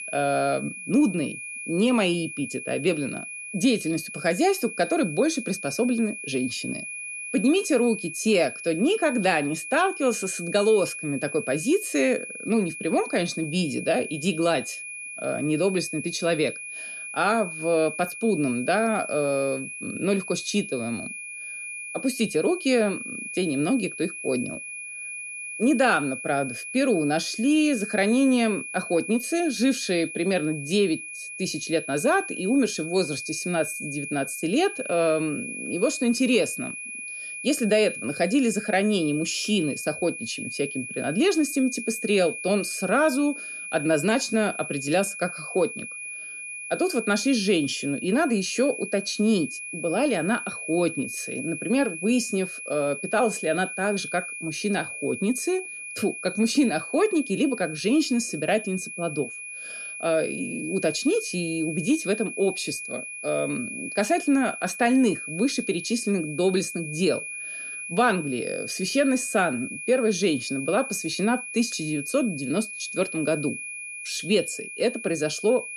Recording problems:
high-pitched whine; loud; throughout; 2.5 kHz, 8 dB below the speech

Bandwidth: 14.5 kHz